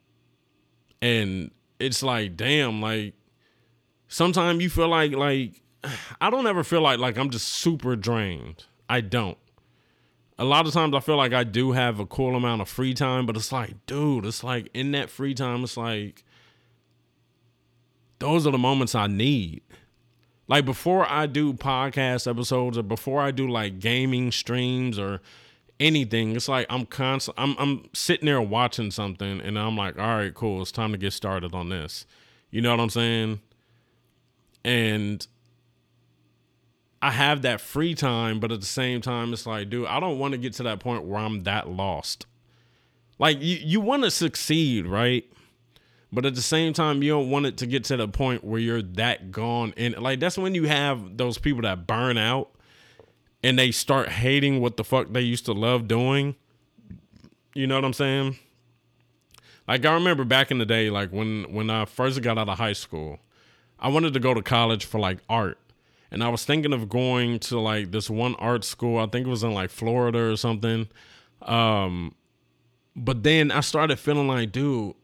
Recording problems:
none

